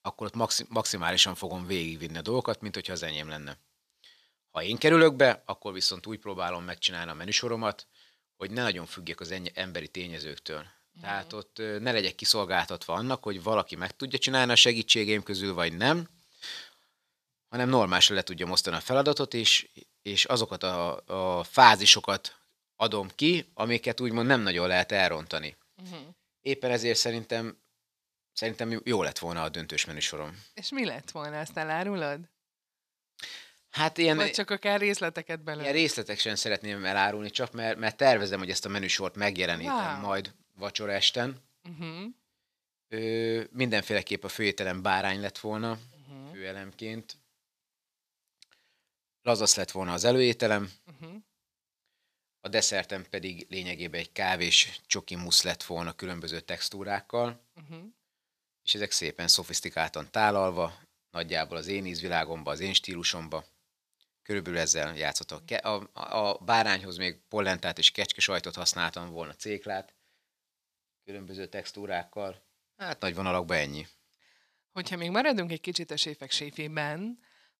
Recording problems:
thin; somewhat; fading below 1 kHz

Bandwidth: 14.5 kHz